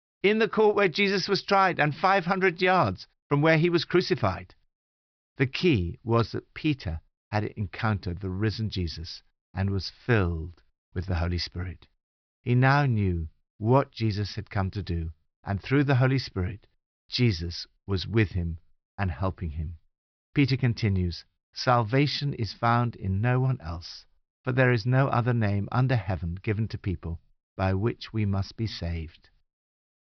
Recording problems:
high frequencies cut off; noticeable; nothing above 5.5 kHz

